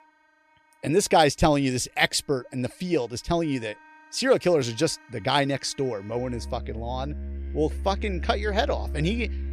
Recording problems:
background music; loud; throughout; 9 dB below the speech

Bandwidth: 13.5 kHz